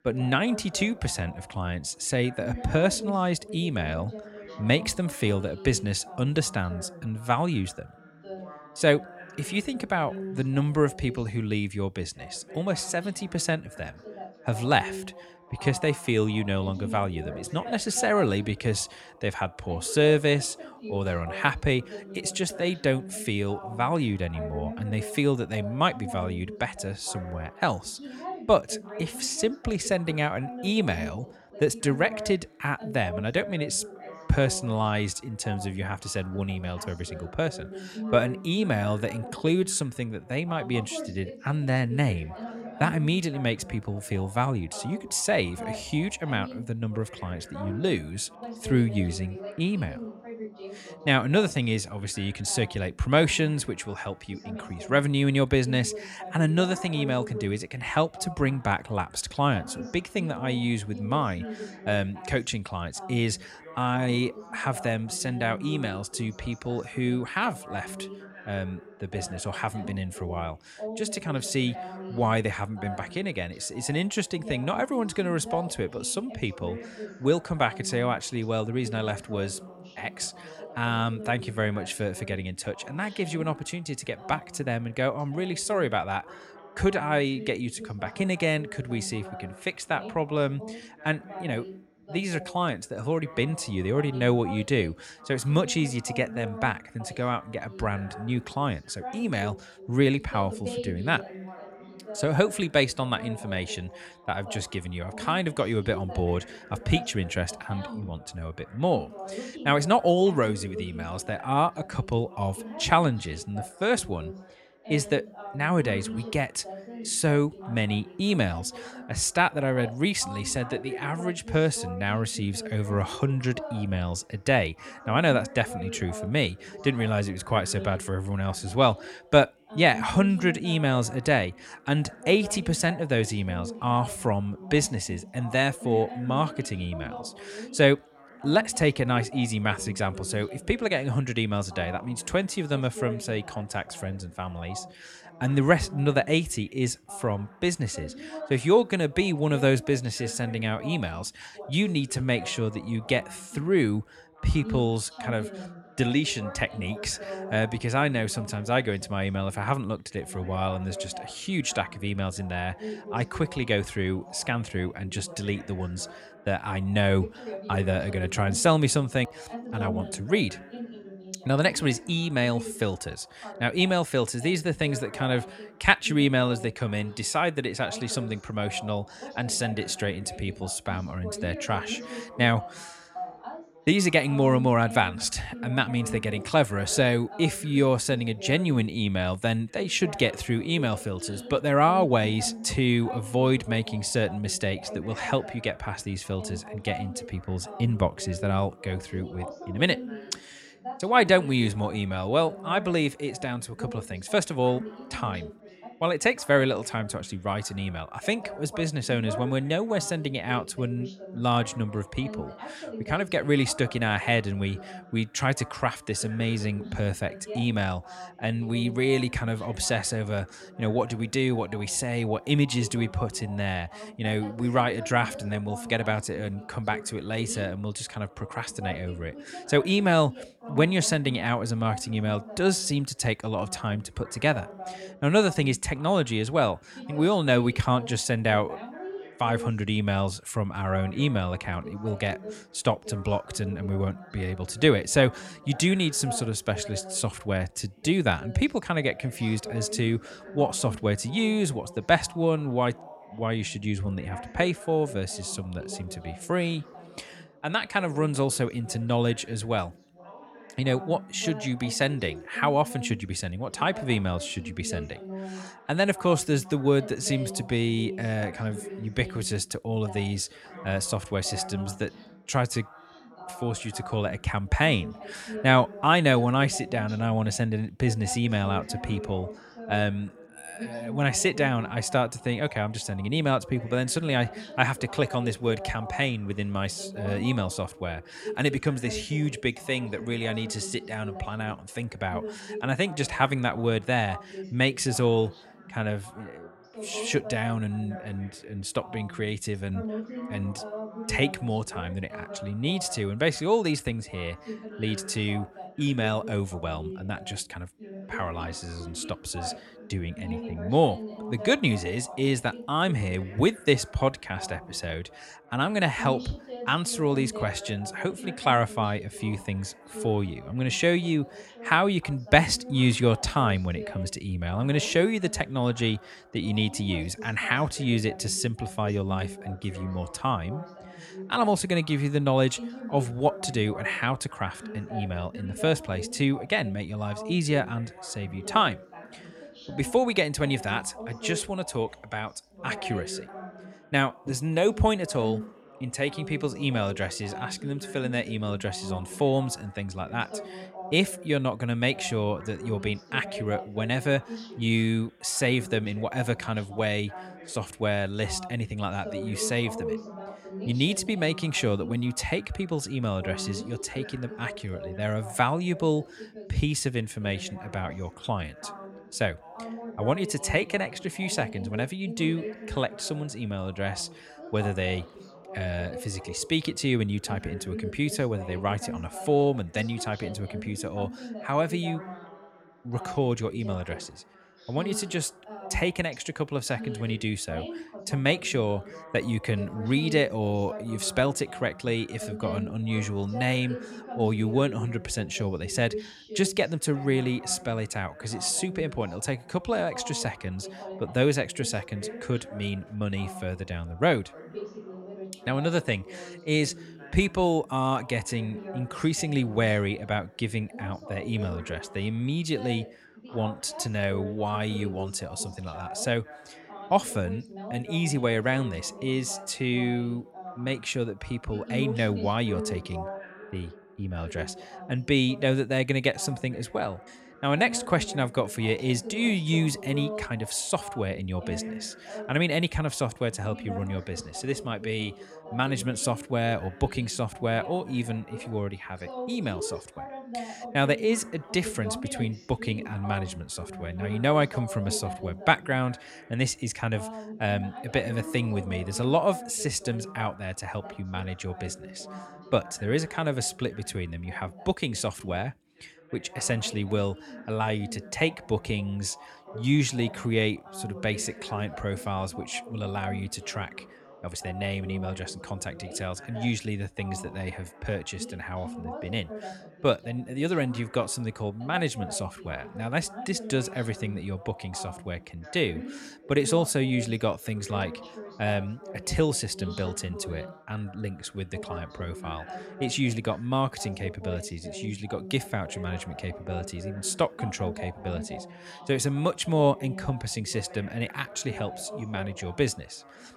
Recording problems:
background chatter; noticeable; throughout; 2 voices, 15 dB below the speech

